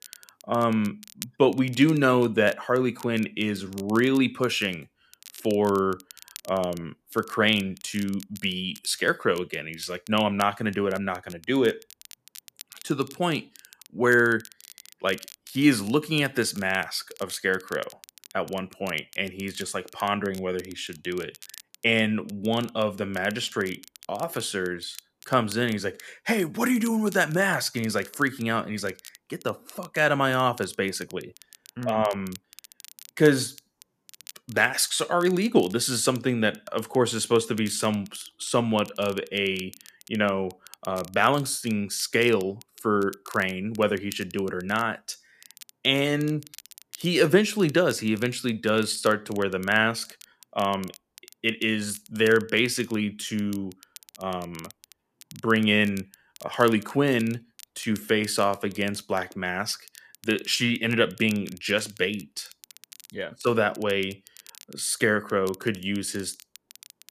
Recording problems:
crackle, like an old record; faint; 20 dB below the speech

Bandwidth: 14.5 kHz